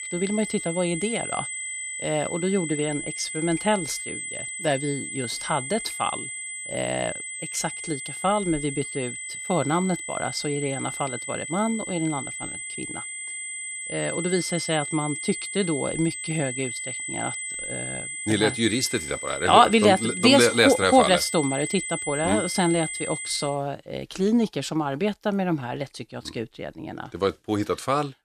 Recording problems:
high-pitched whine; loud; until 23 s; 2 kHz, 6 dB below the speech

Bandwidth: 14.5 kHz